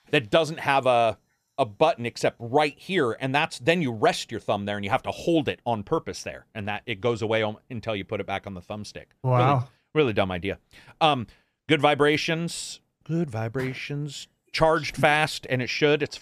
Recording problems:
none

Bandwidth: 14.5 kHz